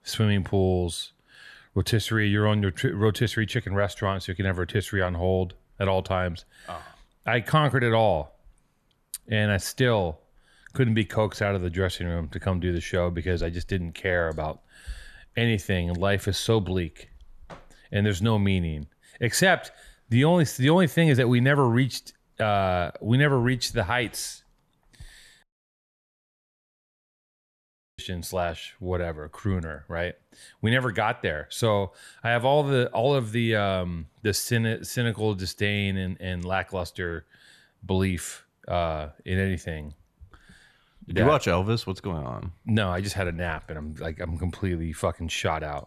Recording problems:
audio cutting out; at 25 s for 2.5 s

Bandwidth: 13.5 kHz